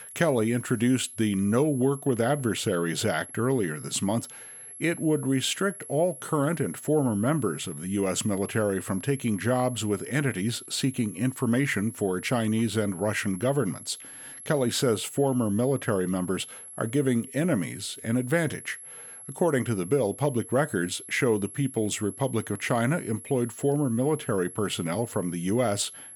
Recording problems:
high-pitched whine; noticeable; throughout; 11 kHz, 15 dB below the speech

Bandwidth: 18 kHz